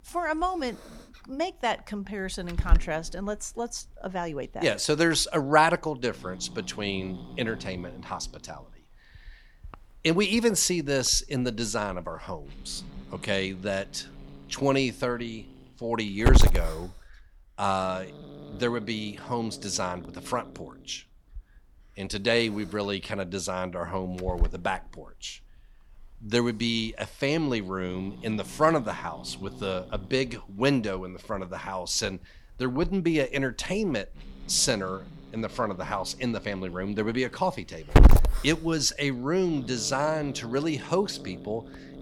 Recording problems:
hiss; loud; throughout; 2 dB below the speech

